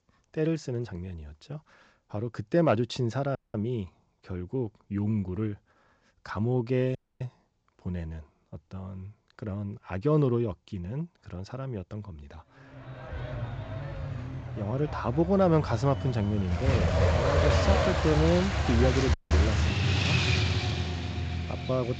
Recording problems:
garbled, watery; slightly; nothing above 7.5 kHz
traffic noise; very loud; from 13 s on; 1 dB above the speech
audio cutting out; at 3.5 s, at 7 s and at 19 s

